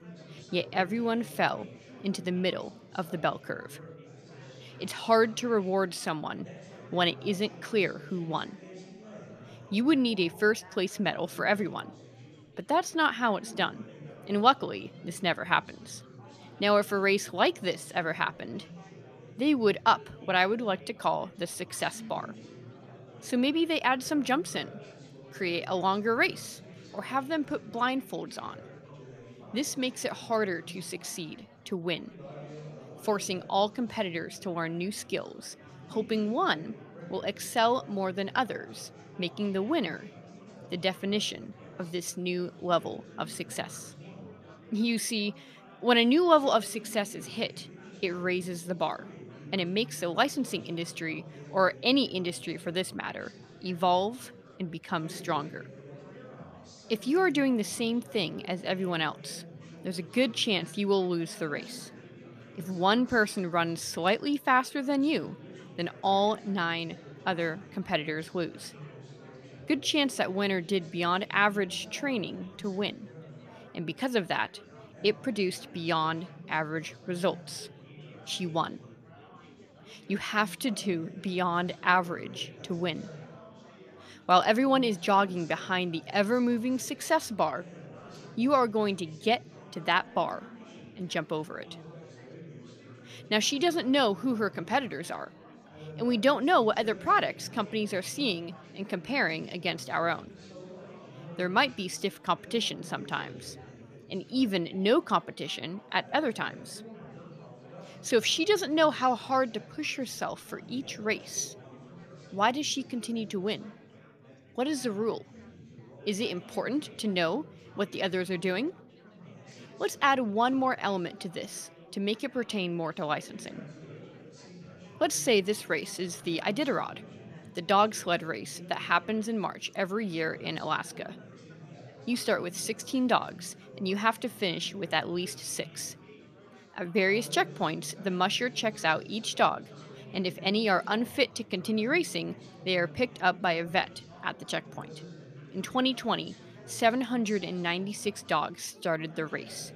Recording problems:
chatter from many people; noticeable; throughout; 20 dB below the speech

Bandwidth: 14.5 kHz